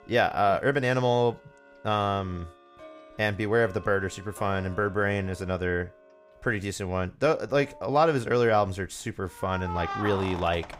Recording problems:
household noises; noticeable; throughout; 15 dB below the speech

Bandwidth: 15.5 kHz